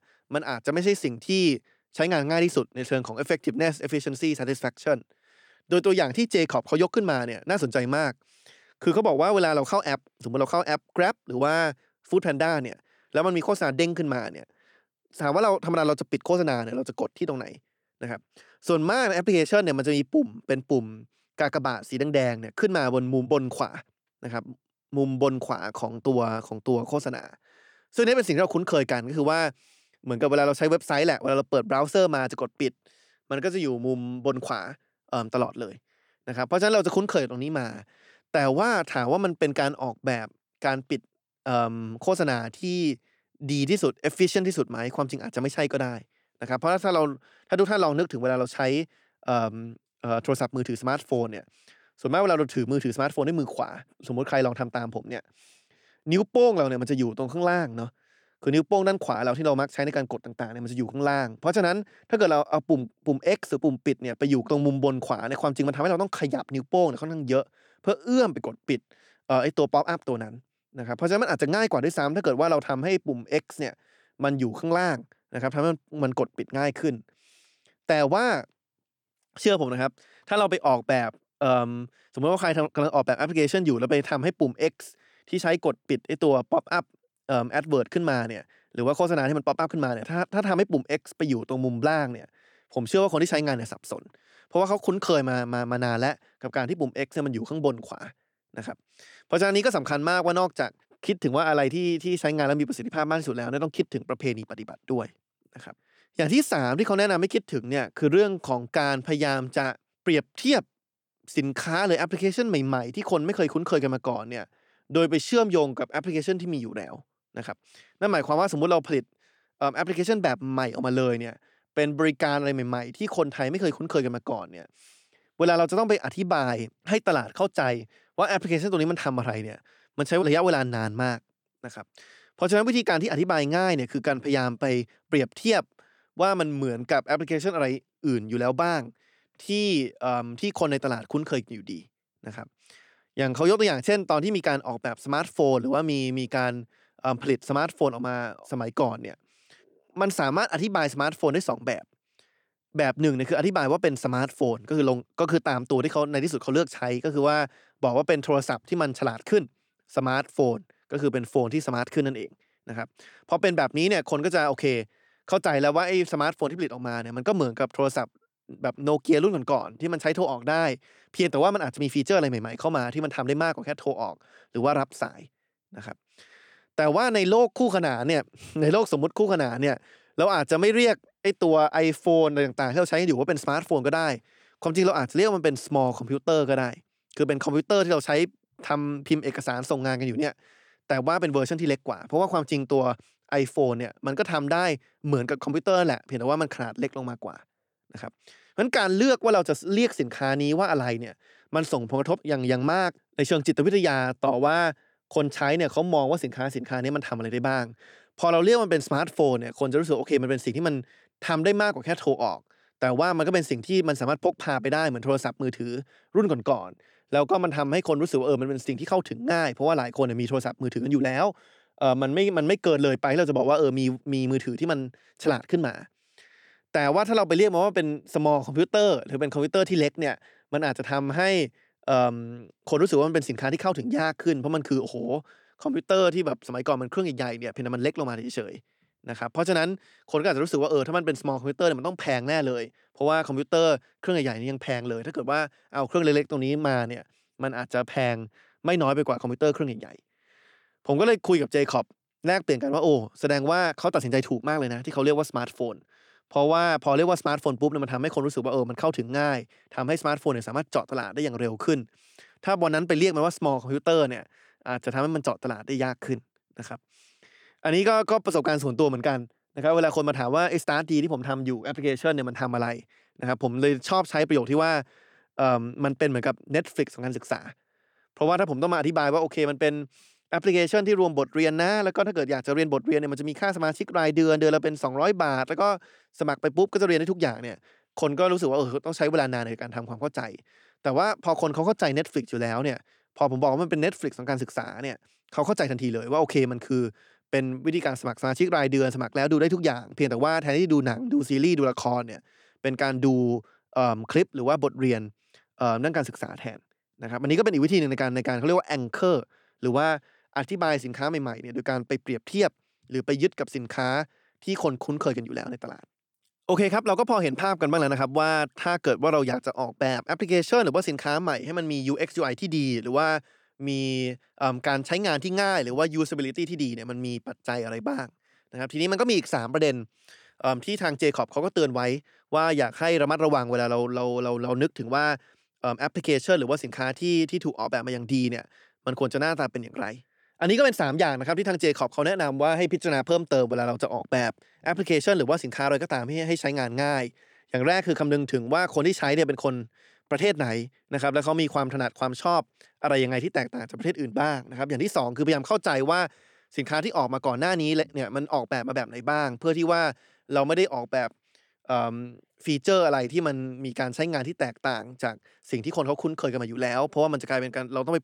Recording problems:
none

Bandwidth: 18.5 kHz